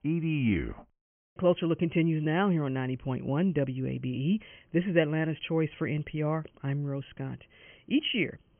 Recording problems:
high frequencies cut off; severe; nothing above 3 kHz

